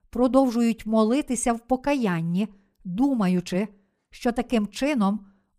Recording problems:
none

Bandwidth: 15 kHz